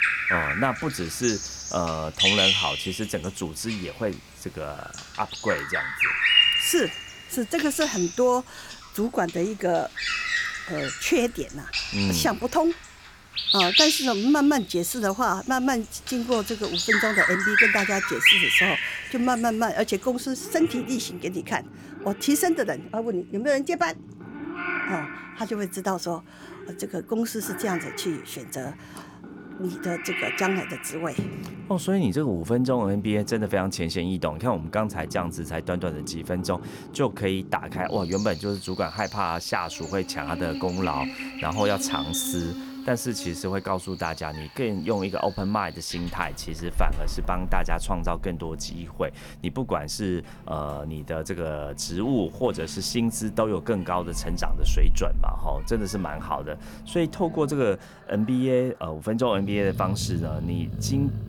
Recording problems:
animal sounds; very loud; throughout; 2 dB above the speech

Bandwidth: 17.5 kHz